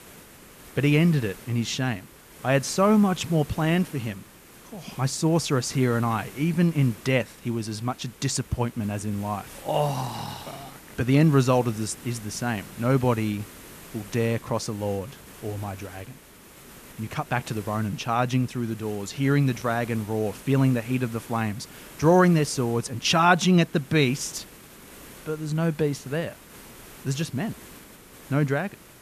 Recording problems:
hiss; noticeable; throughout; 20 dB below the speech

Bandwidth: 14.5 kHz